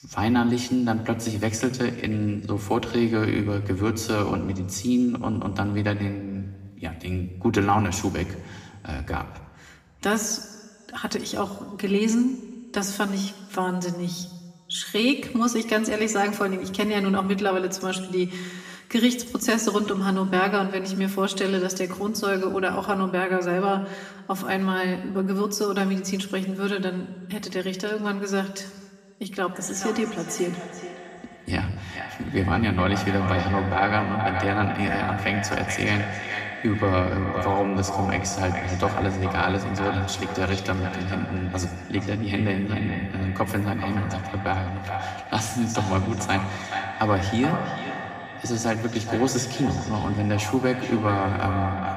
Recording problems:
echo of what is said; strong; from 30 s on; 430 ms later, 7 dB below the speech
room echo; slight; dies away in 1.3 s
off-mic speech; somewhat distant

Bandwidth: 15 kHz